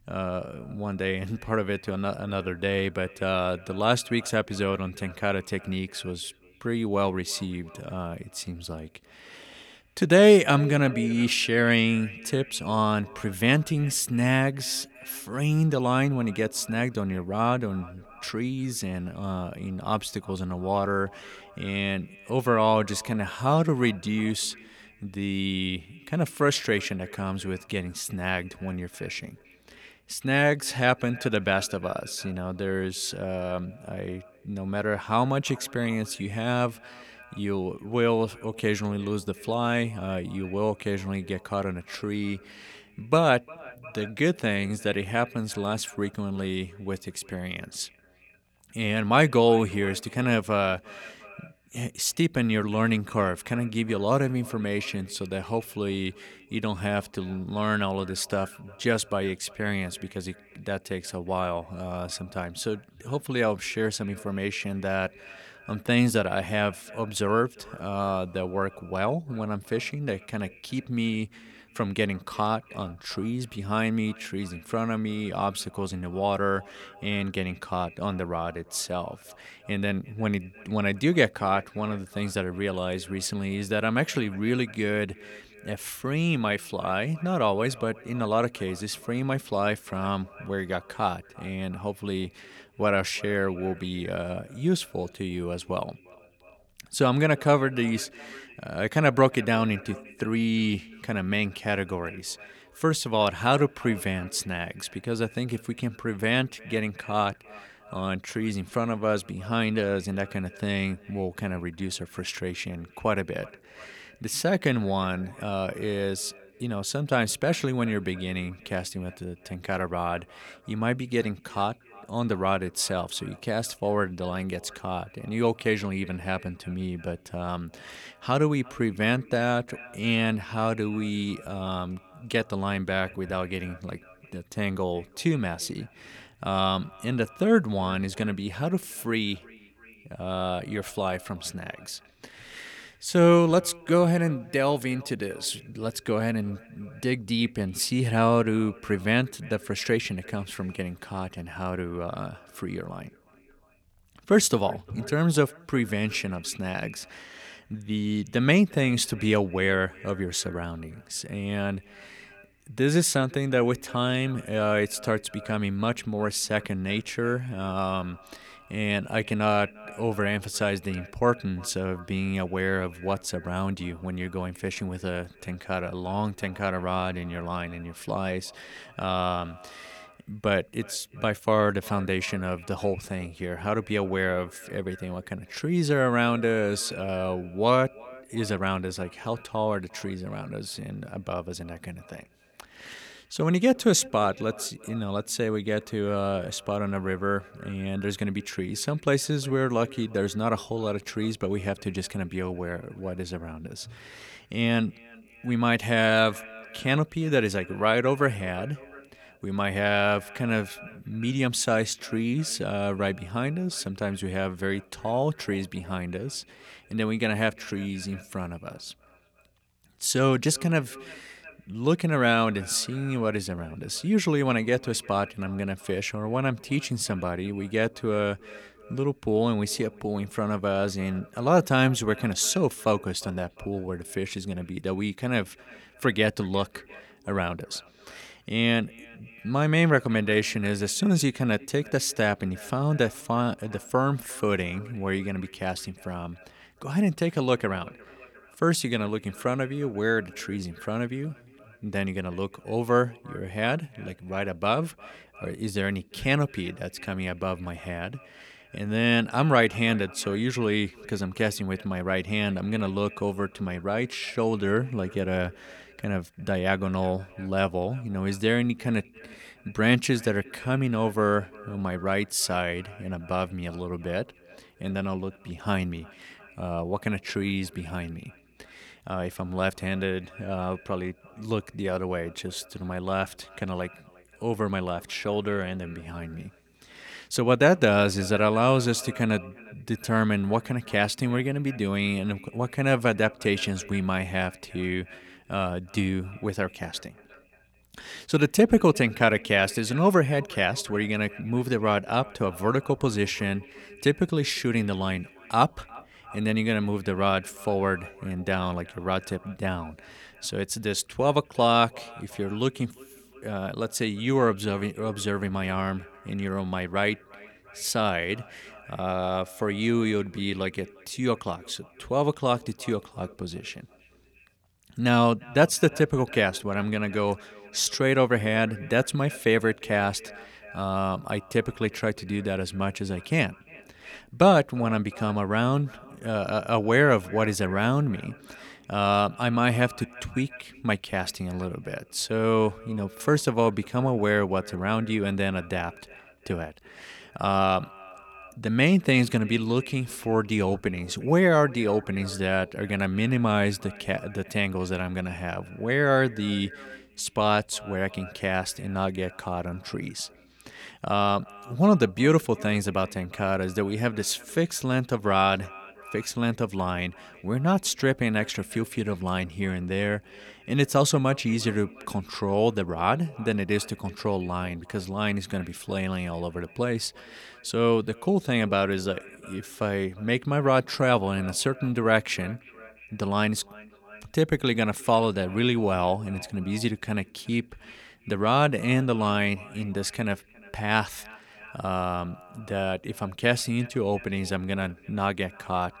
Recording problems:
echo of what is said; faint; throughout; 350 ms later, 20 dB below the speech

